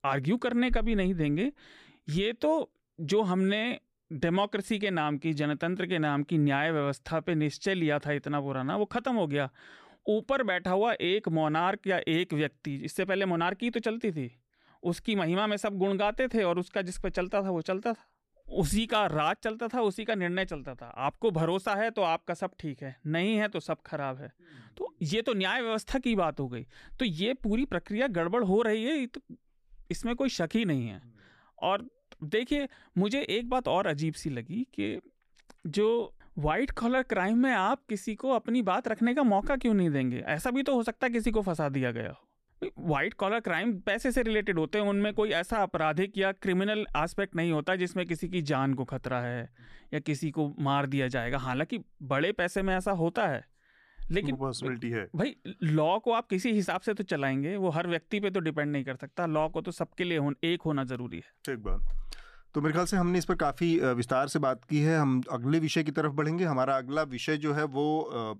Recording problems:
none

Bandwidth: 14.5 kHz